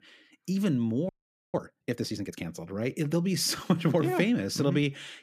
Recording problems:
audio freezing; at 1 s

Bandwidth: 14.5 kHz